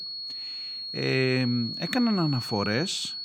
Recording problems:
high-pitched whine; loud; throughout; 4.5 kHz, 6 dB below the speech

